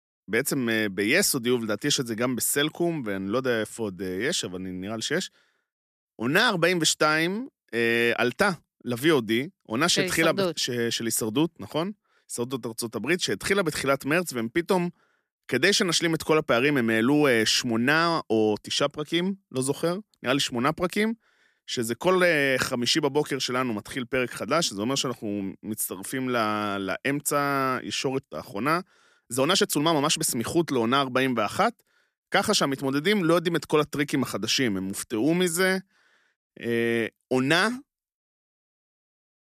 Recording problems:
uneven, jittery; strongly; from 6 to 36 s

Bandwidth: 14.5 kHz